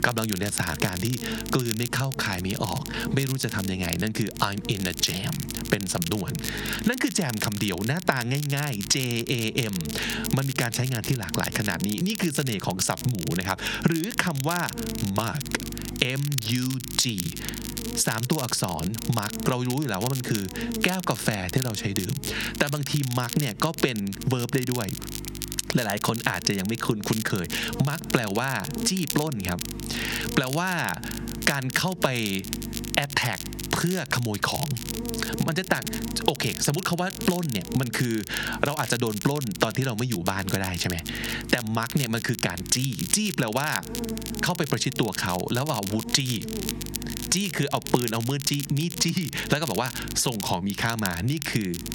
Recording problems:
squashed, flat; heavily
crackle, like an old record; loud; 8 dB below the speech
electrical hum; noticeable; throughout; 50 Hz, 15 dB below the speech

